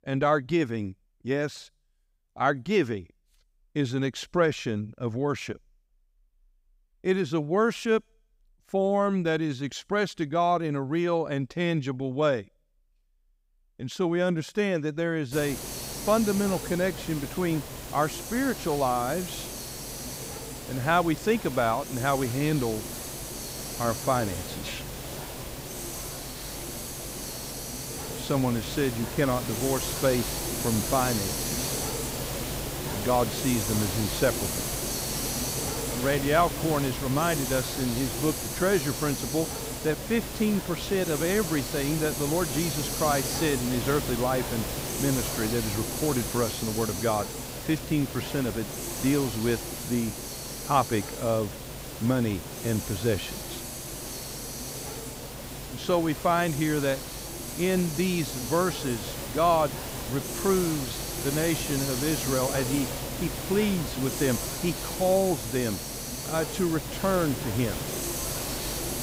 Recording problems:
hiss; loud; from 15 s on; 5 dB below the speech

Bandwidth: 15.5 kHz